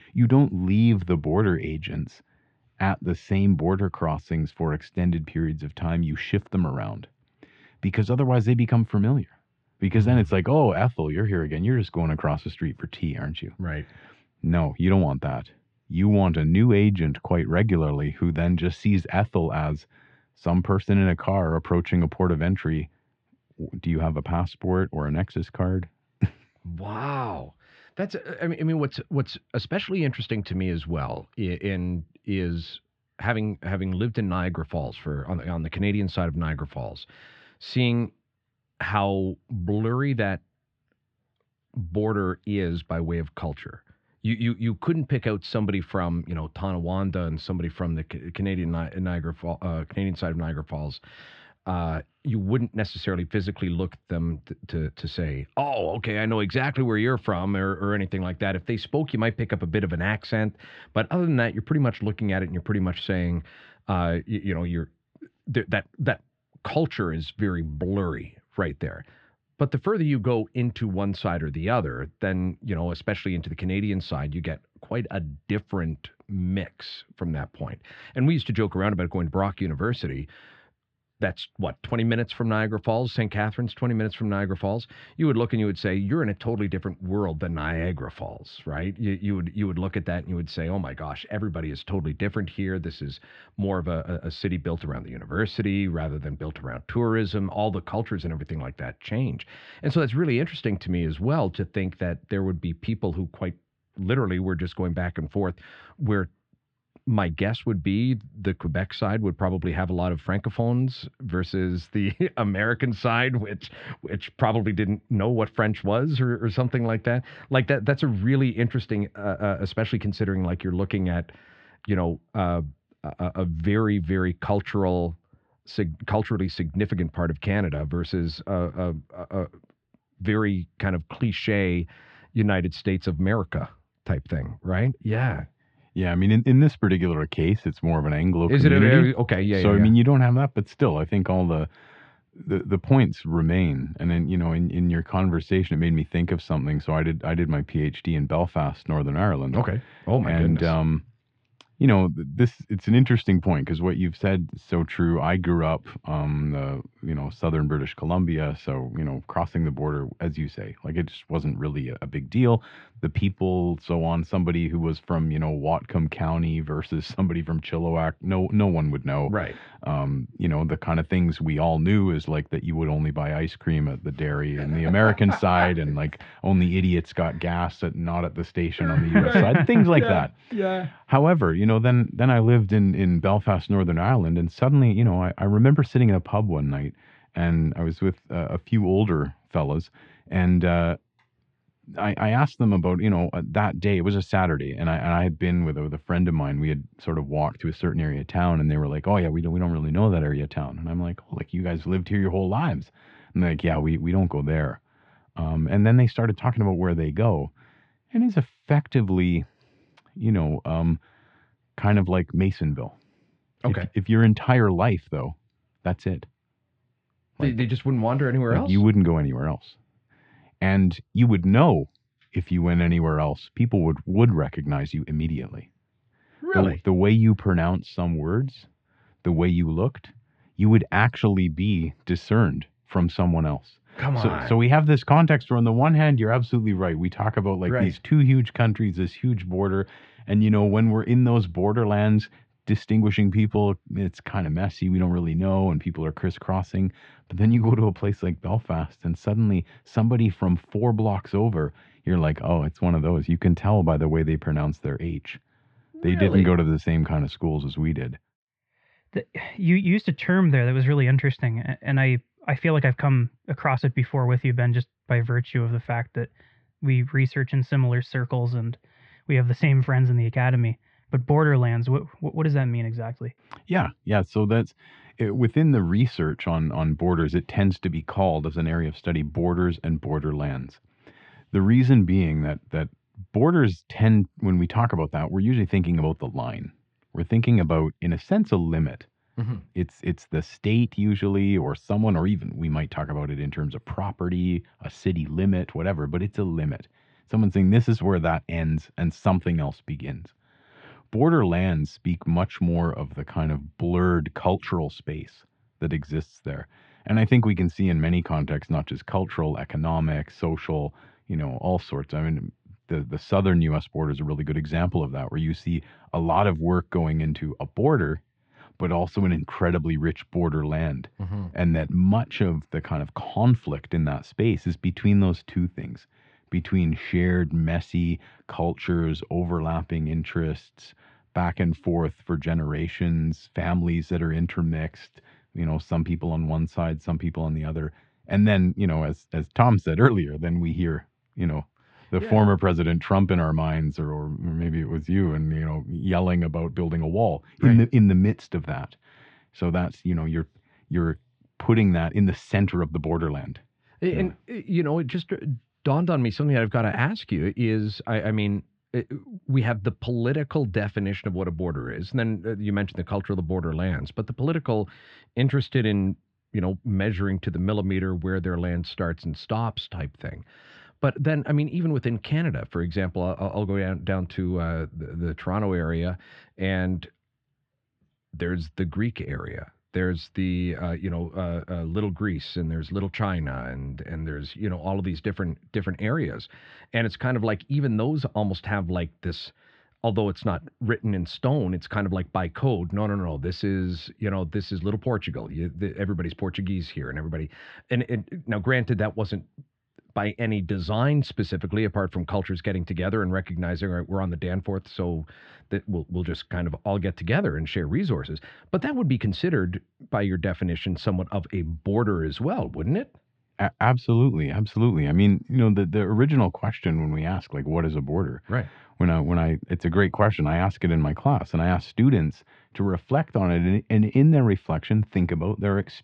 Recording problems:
muffled; slightly; fading above 3.5 kHz

